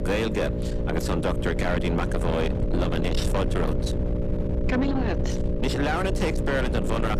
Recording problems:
distortion; heavy; 8 dB below the speech
electrical hum; loud; throughout; 60 Hz, 7 dB below the speech
low rumble; loud; throughout; 9 dB below the speech

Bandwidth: 14.5 kHz